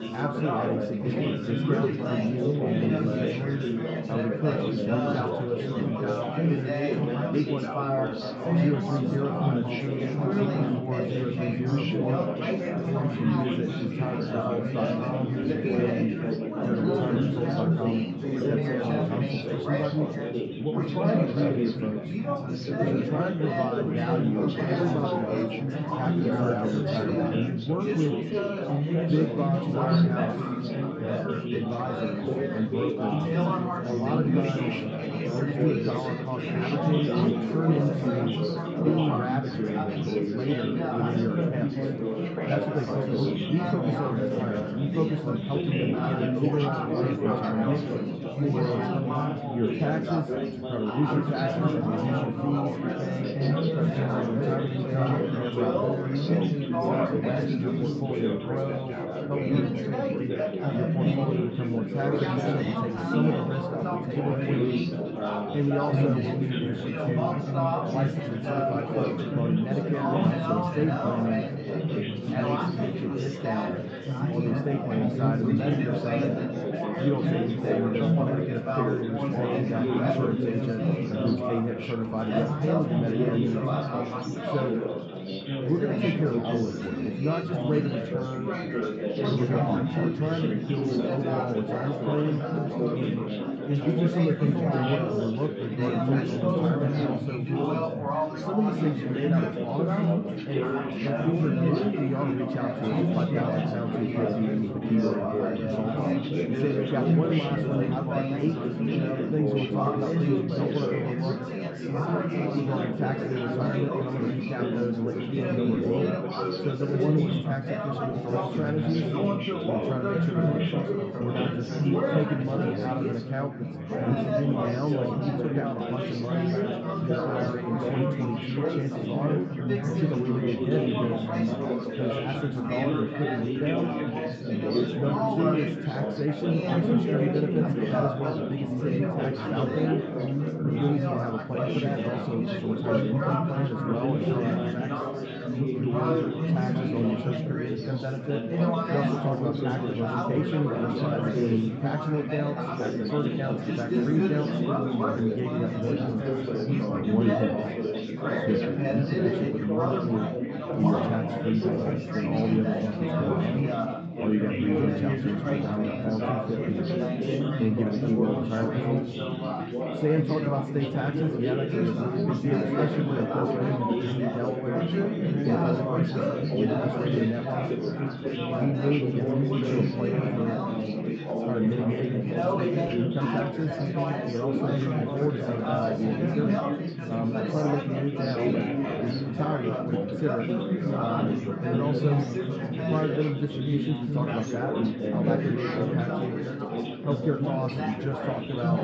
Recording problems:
room echo; noticeable; dies away in 1.9 s
muffled; slightly; fading above 3 kHz
off-mic speech; somewhat distant
chatter from many people; very loud; throughout; 2 dB above the speech

